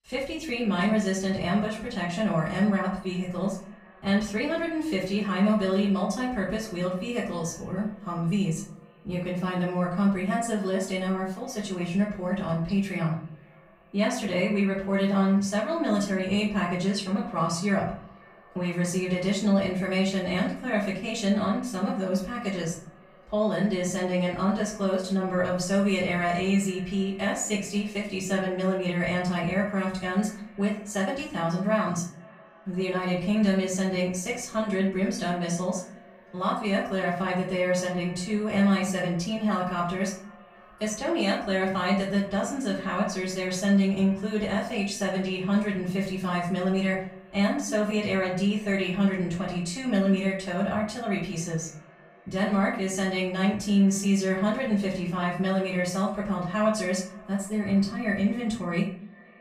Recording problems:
off-mic speech; far
room echo; noticeable; dies away in 0.5 s
echo of what is said; faint; throughout; 490 ms later, 25 dB below the speech

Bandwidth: 15.5 kHz